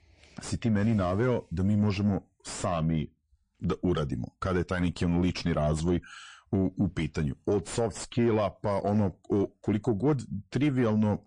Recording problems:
distortion; slight; 9 dB below the speech
garbled, watery; slightly; nothing above 9 kHz

